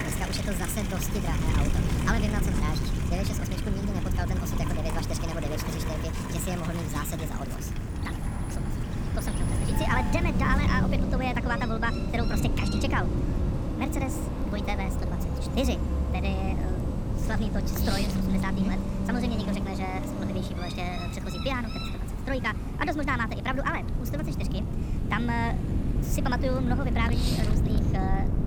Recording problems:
wrong speed and pitch; too fast and too high; 1.5 times normal speed
wind noise on the microphone; heavy; 8 dB below the speech
animal sounds; loud; throughout; 10 dB below the speech
traffic noise; loud; throughout; 3 dB below the speech
rain or running water; faint; throughout; 25 dB below the speech

